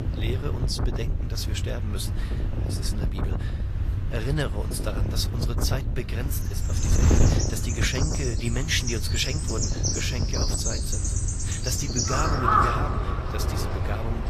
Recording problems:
garbled, watery; slightly; nothing above 14.5 kHz
animal sounds; very loud; from 7 s on; 3 dB above the speech
wind noise on the microphone; heavy; 6 dB below the speech

